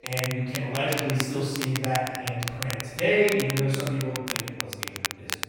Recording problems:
room echo; strong; dies away in 1.5 s
off-mic speech; far
crackle, like an old record; loud; 6 dB below the speech
background chatter; faint; throughout; 3 voices, 30 dB below the speech

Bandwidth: 16.5 kHz